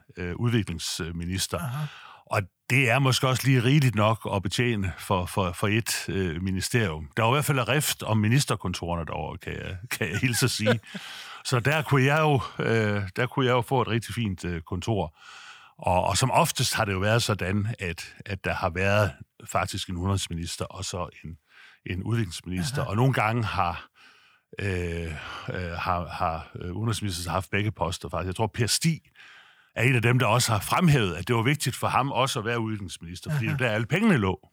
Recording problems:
none

